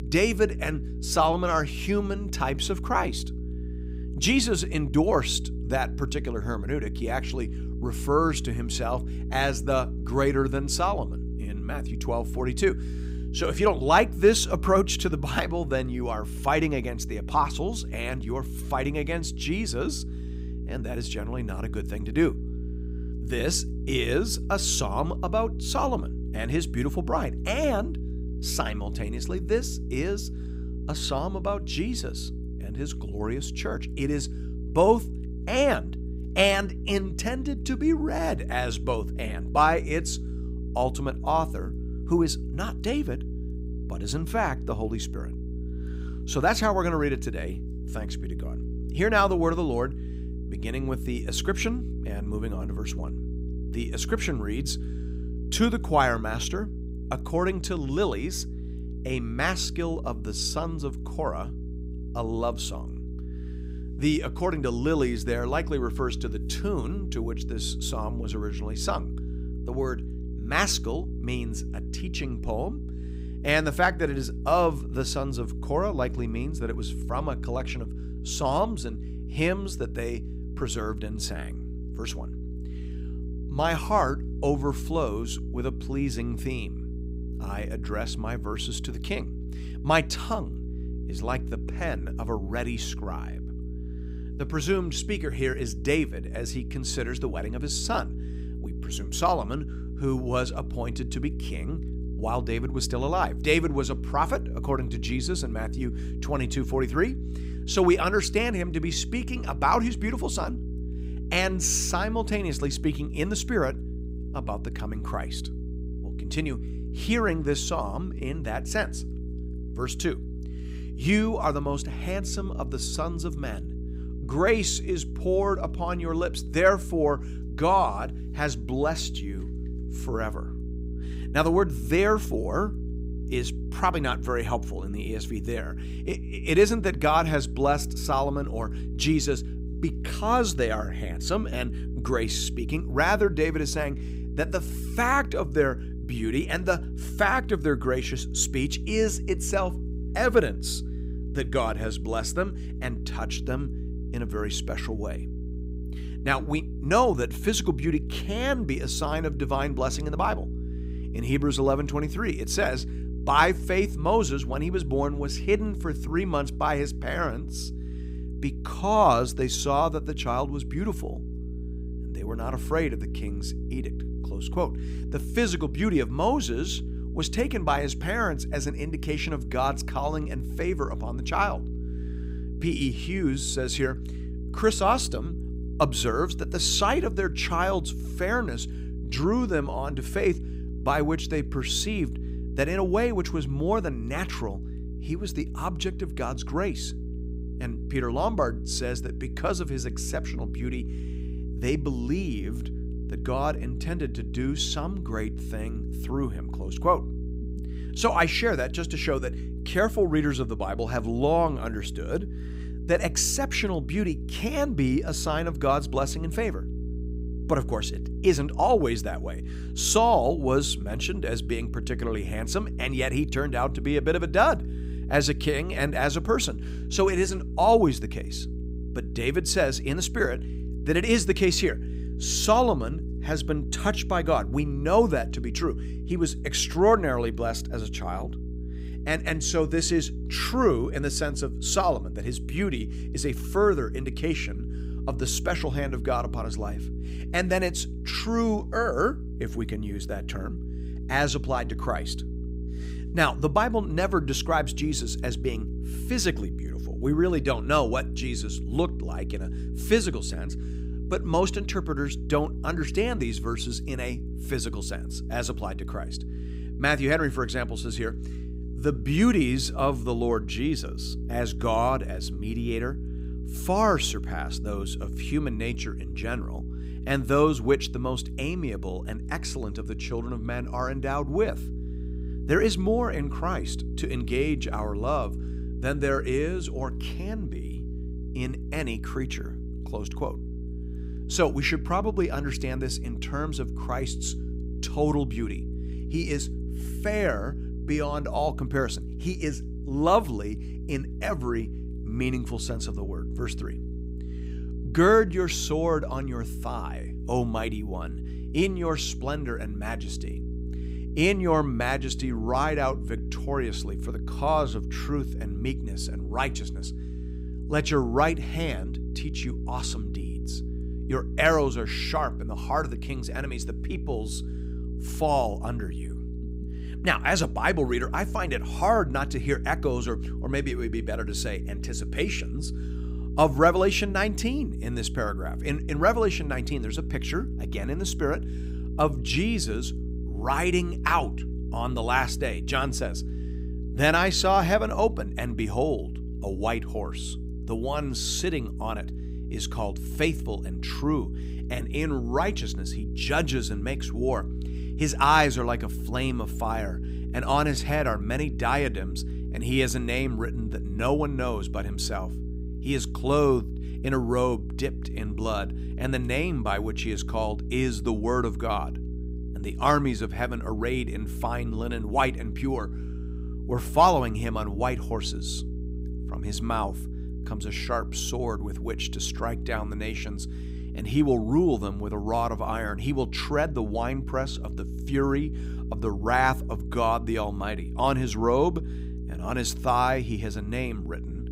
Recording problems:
electrical hum; noticeable; throughout; 60 Hz, 15 dB below the speech

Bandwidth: 15.5 kHz